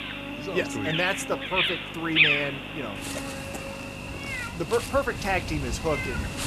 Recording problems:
animal sounds; very loud; throughout; 1 dB above the speech
electrical hum; loud; throughout; 50 Hz, 10 dB below the speech

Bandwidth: 14 kHz